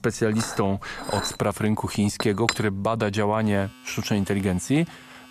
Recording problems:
household noises; loud; throughout; 7 dB below the speech

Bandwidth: 14.5 kHz